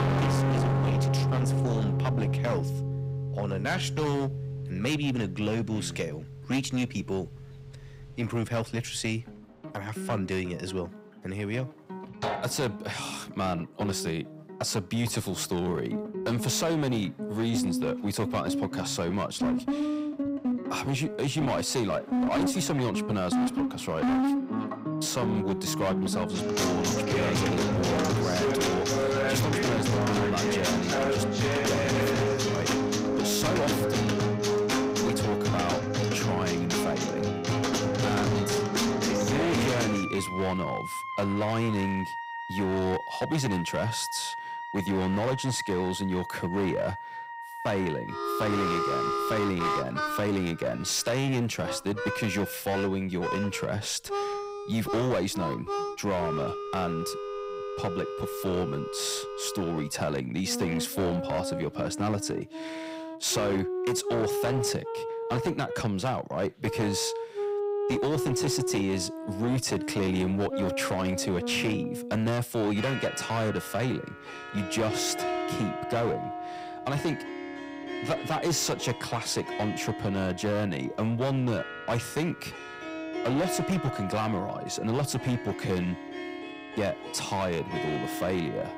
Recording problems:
distortion; heavy; 15% of the sound clipped
background music; loud; throughout; 1 dB below the speech

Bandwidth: 15.5 kHz